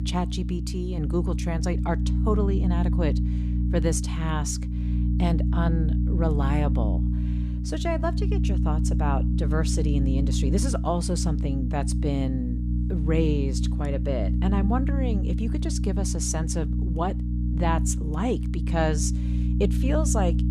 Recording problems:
electrical hum; loud; throughout; 60 Hz, 7 dB below the speech

